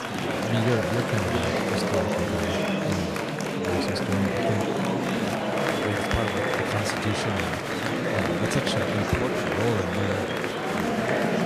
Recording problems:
murmuring crowd; very loud; throughout; 5 dB above the speech

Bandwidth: 14.5 kHz